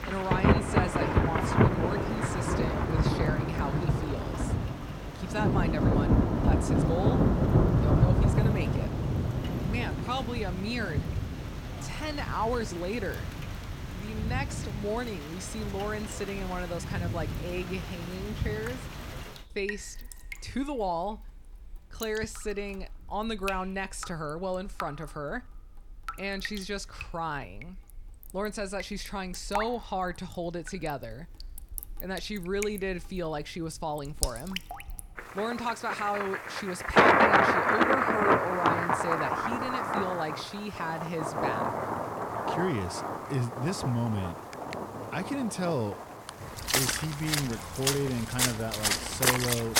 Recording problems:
rain or running water; very loud; throughout; 5 dB above the speech

